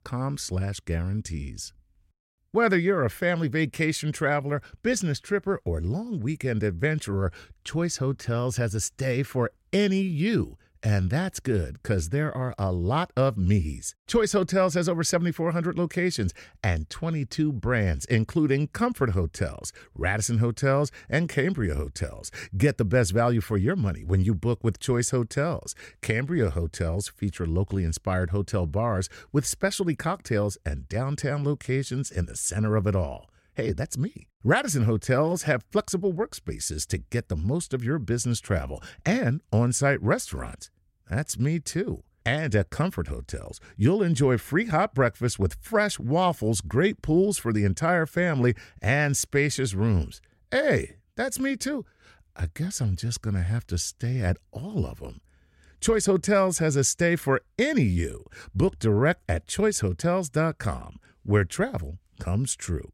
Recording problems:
none

